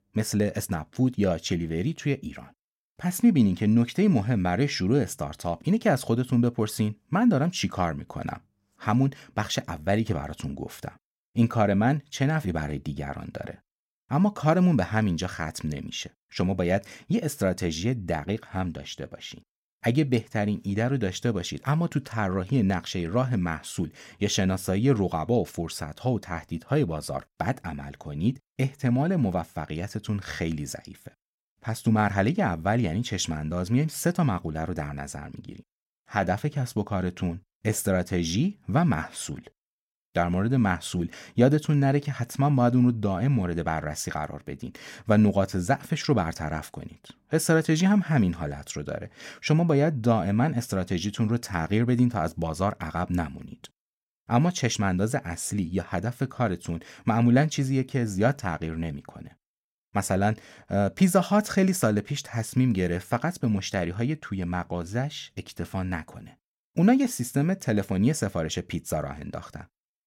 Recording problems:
none

